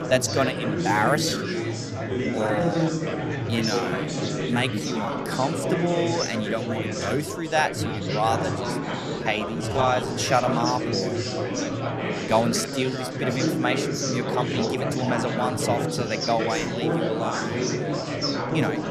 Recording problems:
chatter from many people; very loud; throughout; as loud as the speech
uneven, jittery; strongly; from 1 to 16 s

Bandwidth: 14 kHz